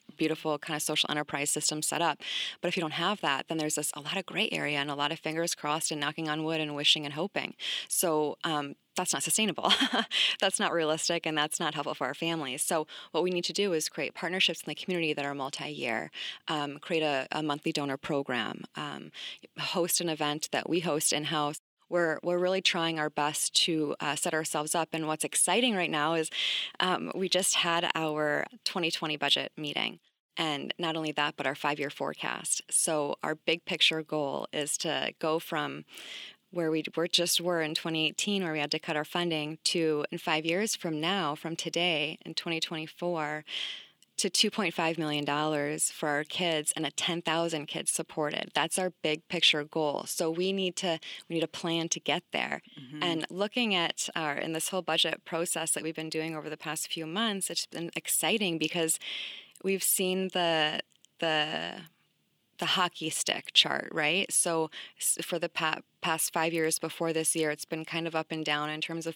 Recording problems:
thin; somewhat; fading below 300 Hz

